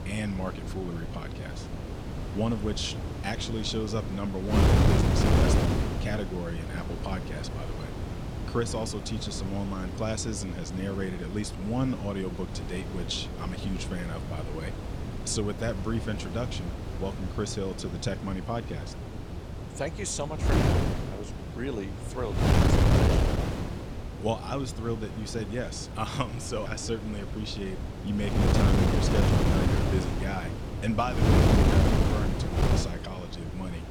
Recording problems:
wind noise on the microphone; heavy; 1 dB above the speech

